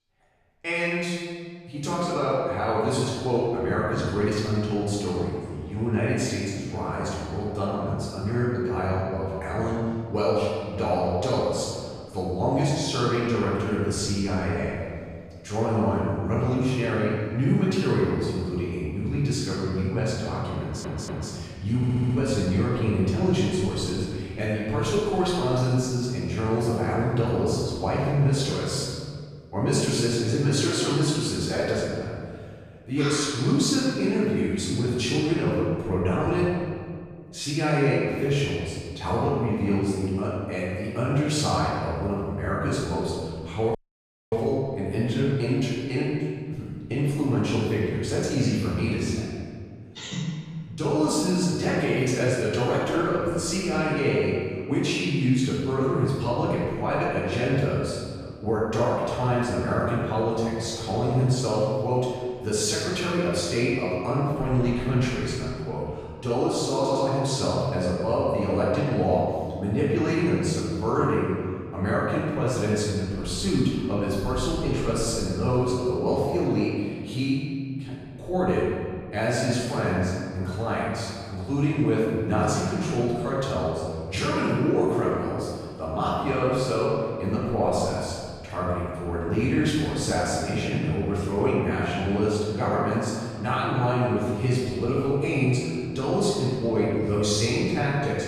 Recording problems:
room echo; strong; dies away in 1.8 s
off-mic speech; far
audio stuttering; at 21 s, at 22 s and at 1:07
audio cutting out; at 44 s for 0.5 s

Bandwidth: 14.5 kHz